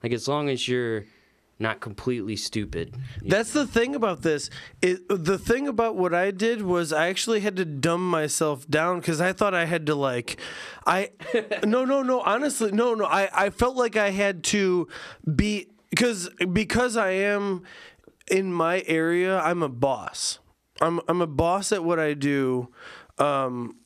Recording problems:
squashed, flat; heavily

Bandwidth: 14.5 kHz